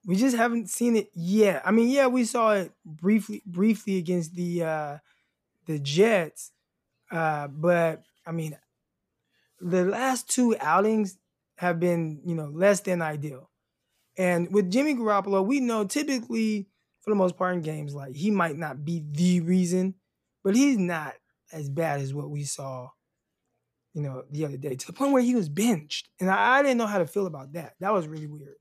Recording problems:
none

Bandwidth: 14.5 kHz